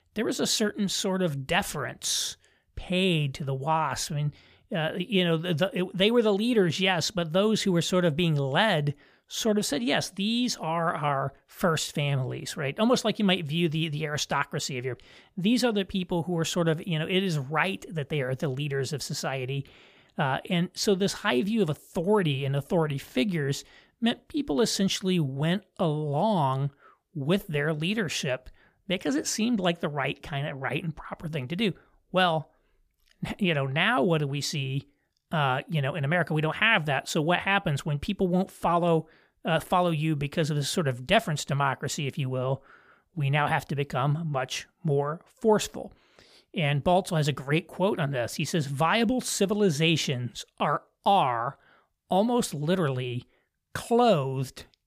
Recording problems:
none

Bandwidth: 15 kHz